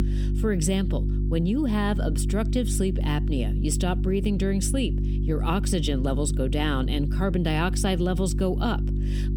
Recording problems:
squashed, flat; somewhat
electrical hum; noticeable; throughout; 50 Hz, 10 dB below the speech

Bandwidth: 18.5 kHz